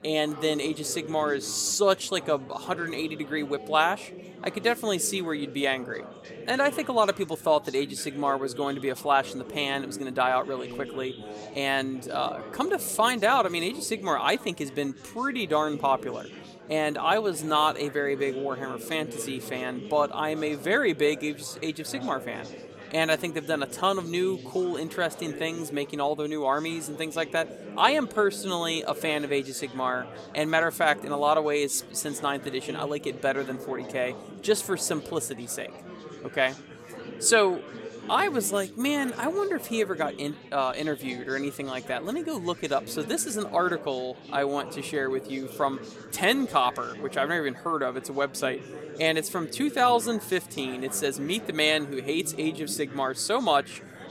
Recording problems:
chatter from many people; noticeable; throughout; 15 dB below the speech

